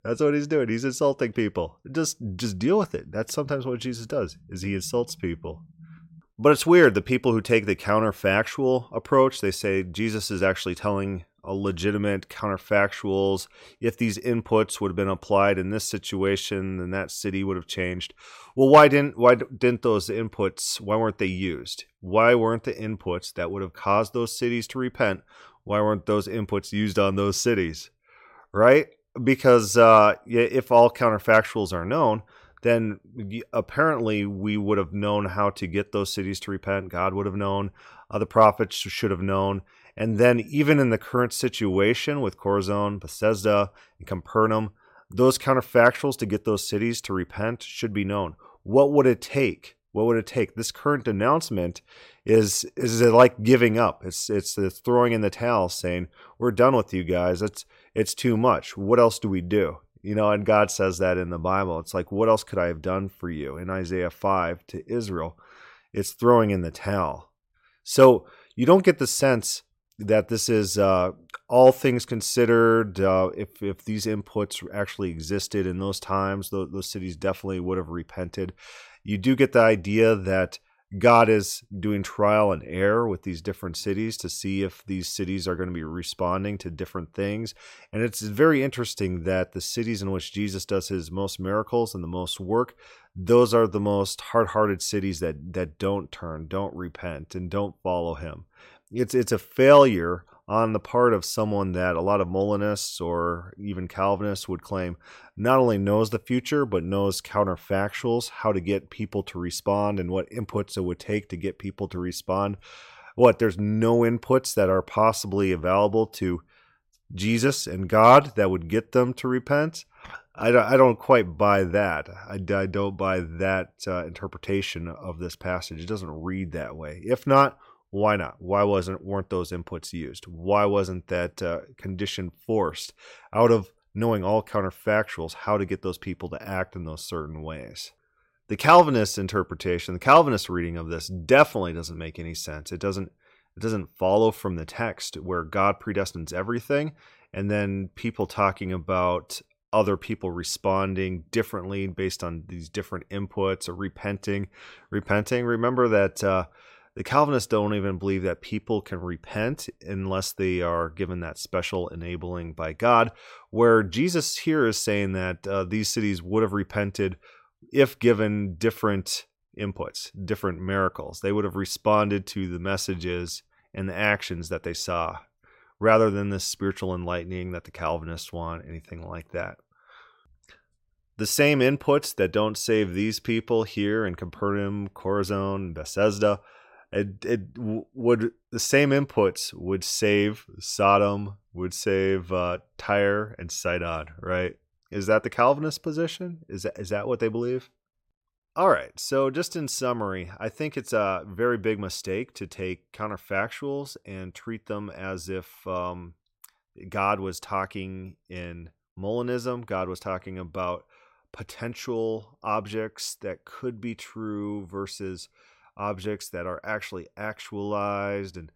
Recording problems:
none

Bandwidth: 16 kHz